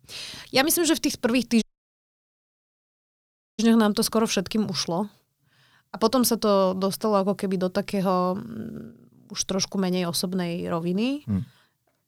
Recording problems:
audio cutting out; at 1.5 s for 2 s

